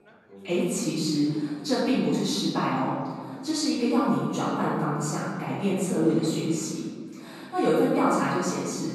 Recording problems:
room echo; strong; dies away in 1.7 s
off-mic speech; far
chatter from many people; faint; throughout; 25 dB below the speech

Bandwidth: 13.5 kHz